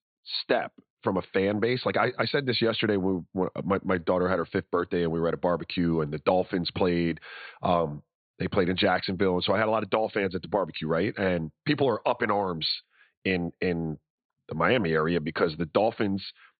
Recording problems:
high frequencies cut off; severe; nothing above 4.5 kHz

